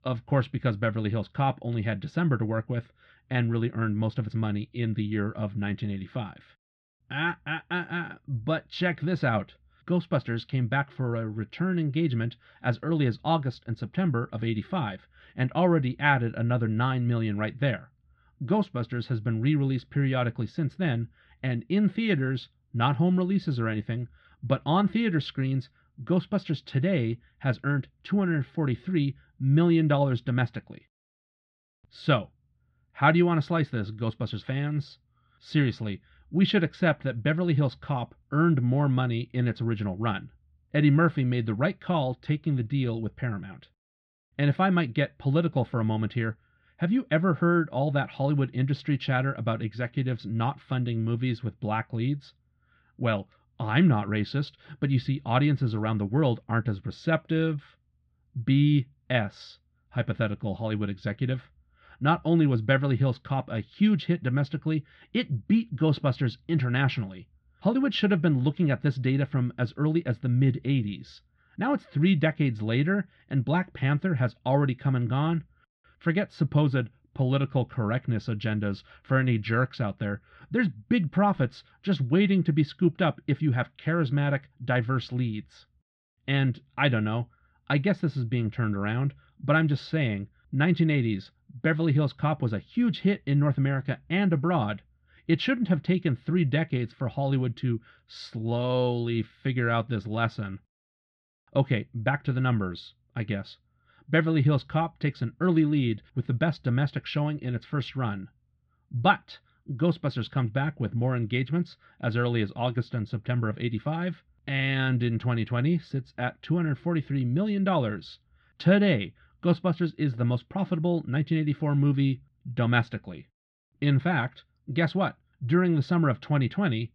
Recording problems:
muffled; slightly; fading above 3.5 kHz

